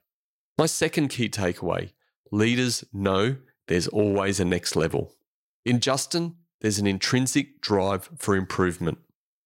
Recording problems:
none

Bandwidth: 16 kHz